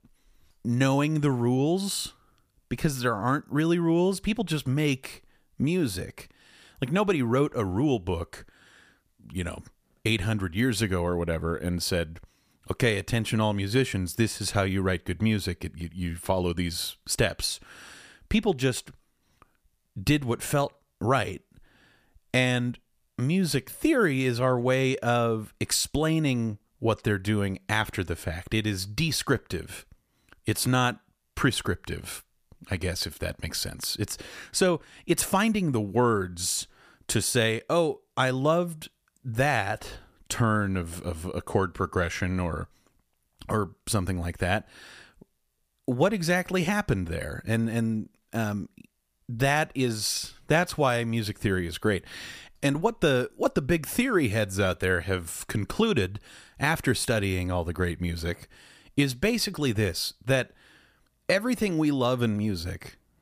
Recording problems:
none

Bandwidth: 15 kHz